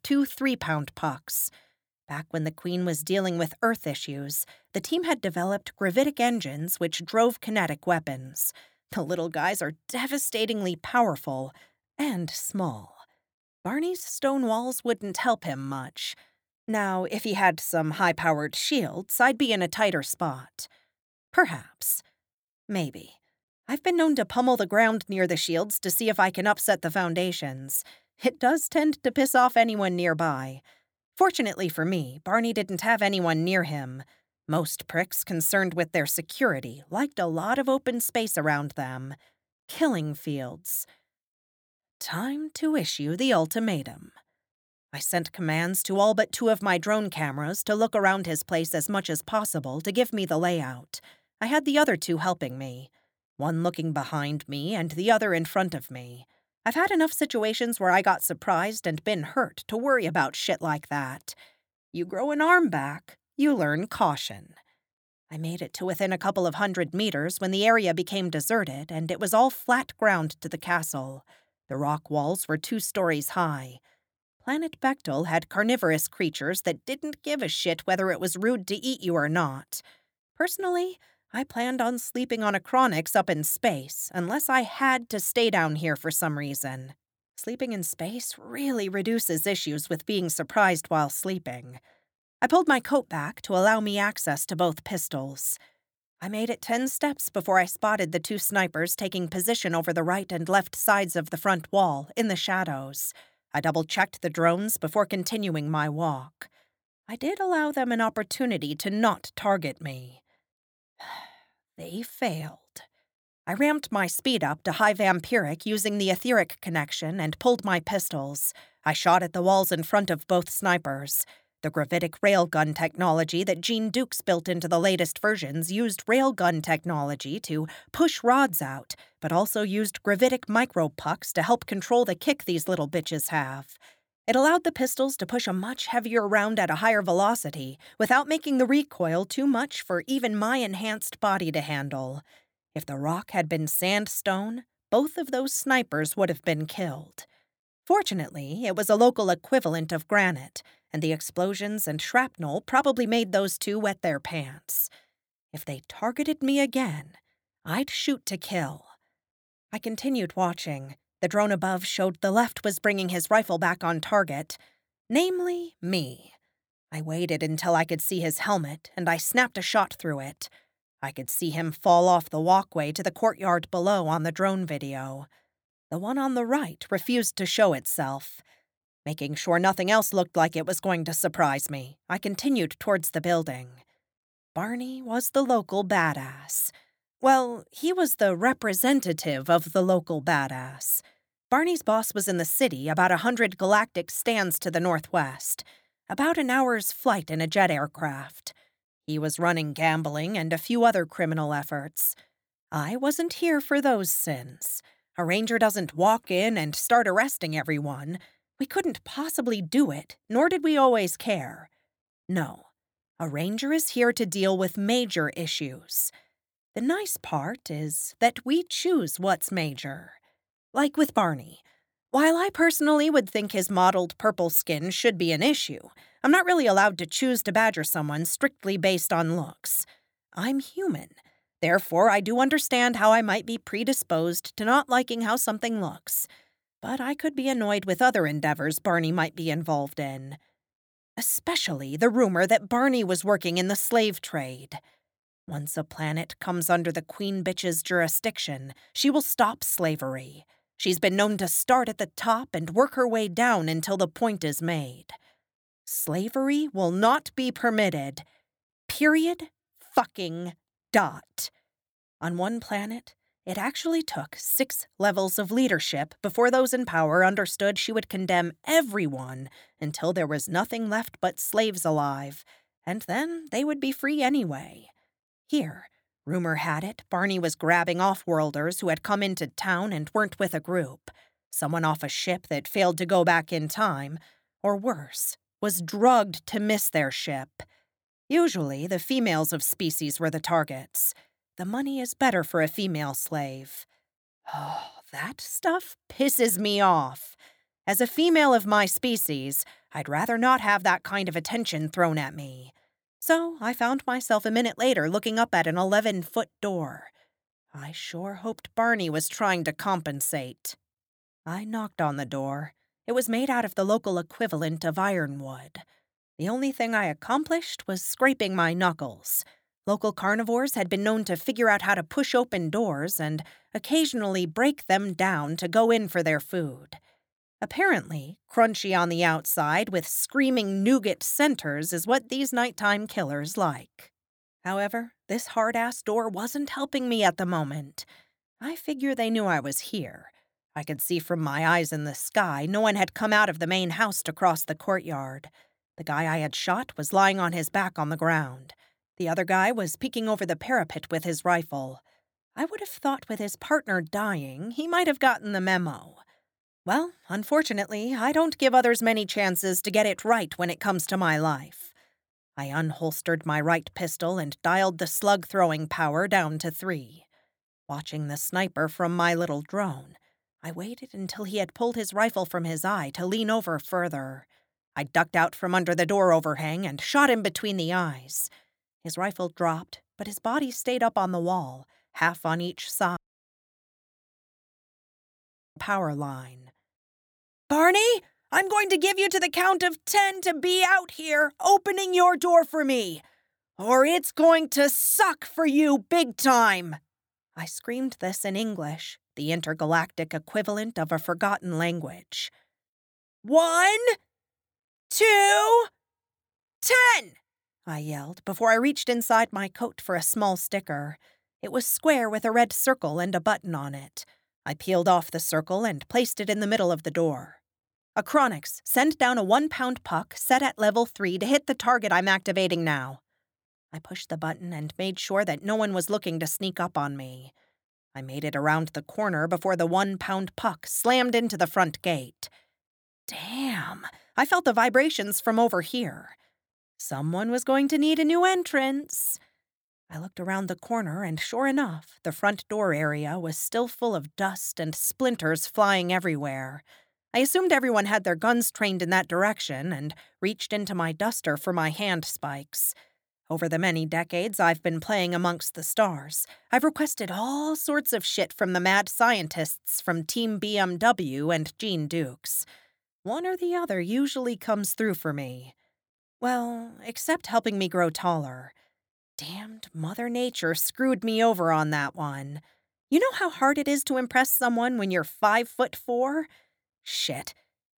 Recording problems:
audio cutting out; at 6:23 for 2.5 s

